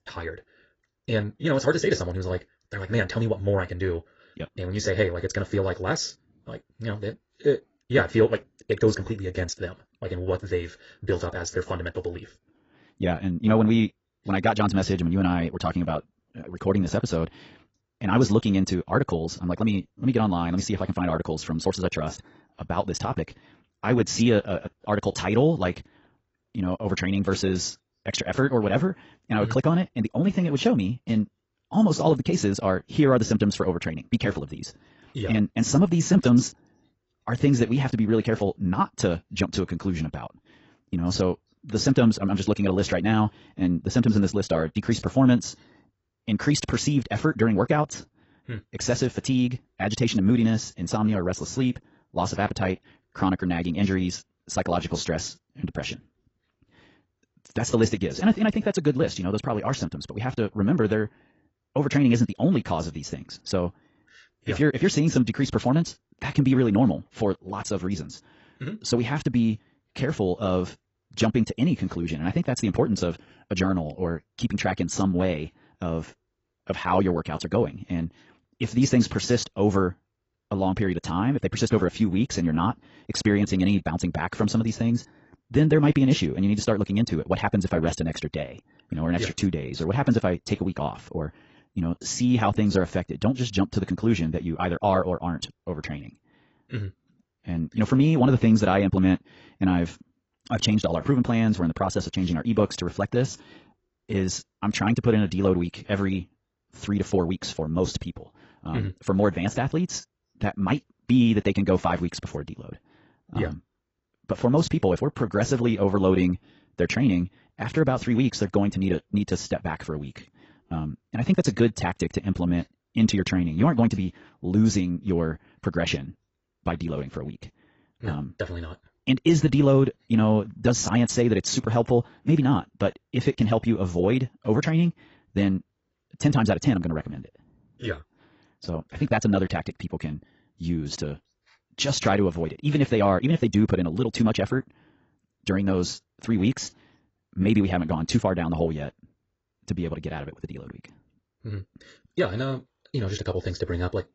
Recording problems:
garbled, watery; badly; nothing above 7.5 kHz
wrong speed, natural pitch; too fast; 1.7 times normal speed

